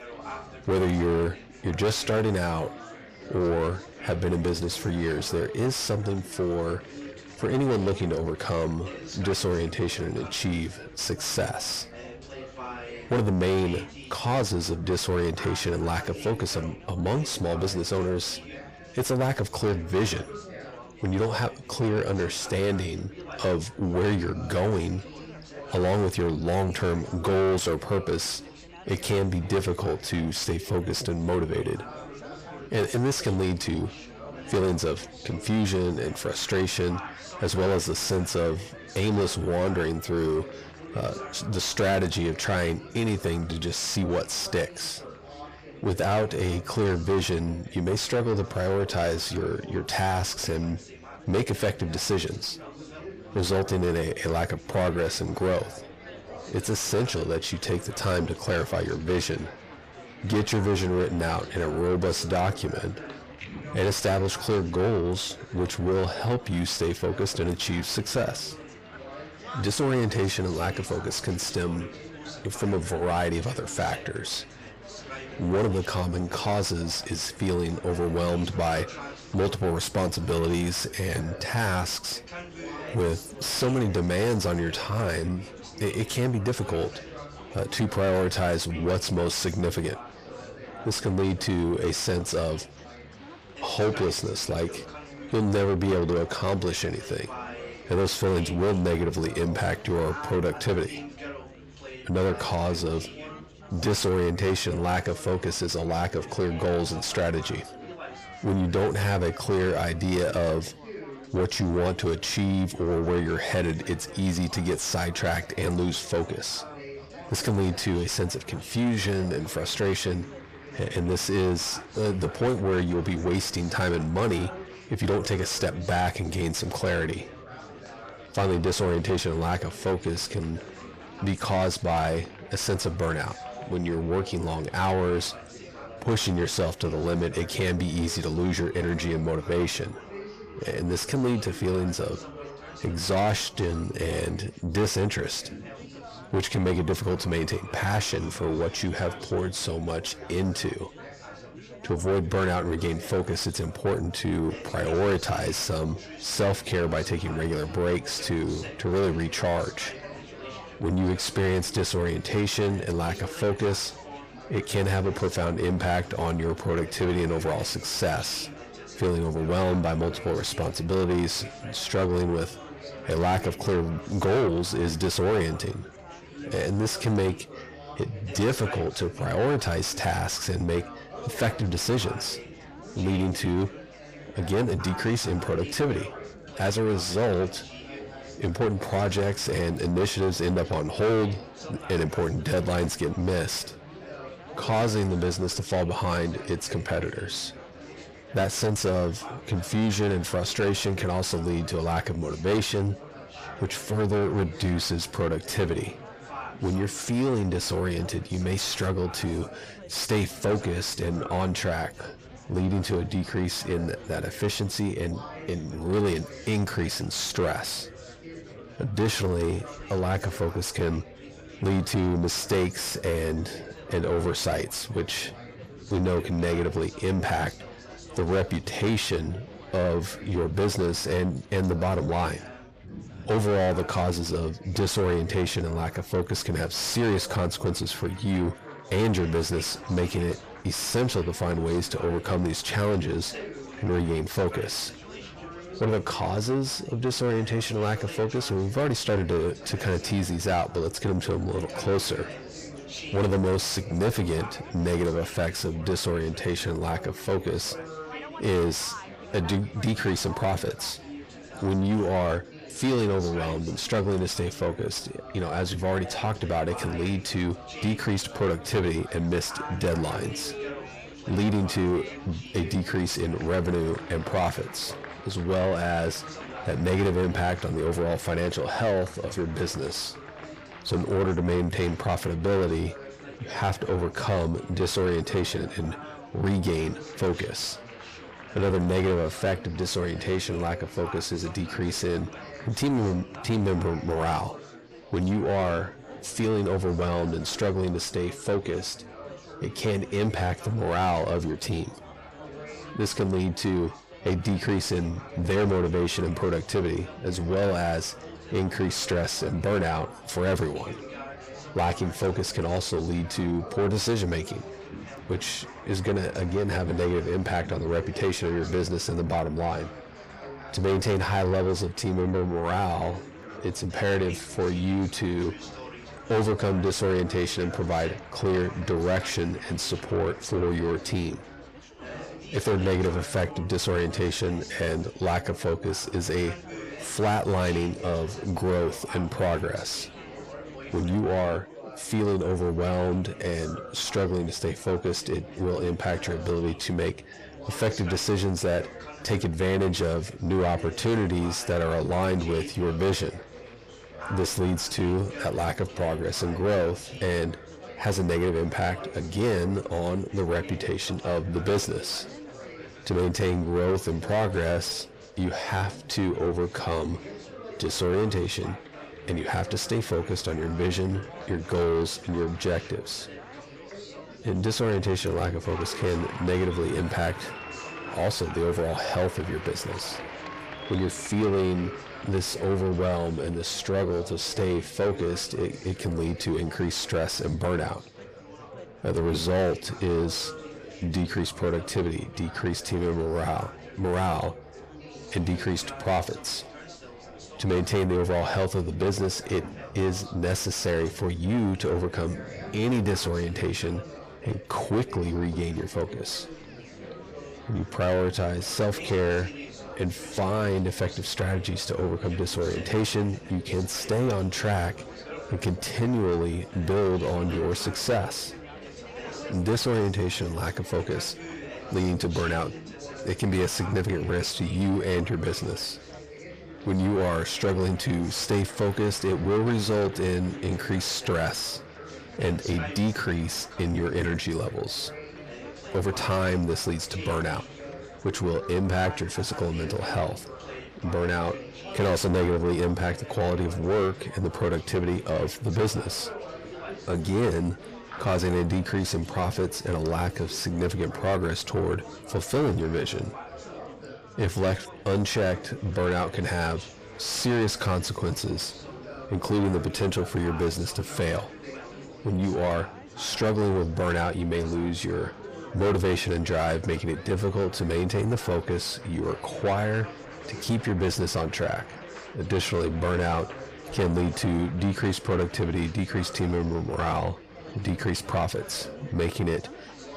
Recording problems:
distortion; heavy; 6 dB below the speech
echo of what is said; faint; from 5:51 on; 500 ms later, 25 dB below the speech
chatter from many people; noticeable; throughout; 15 dB below the speech

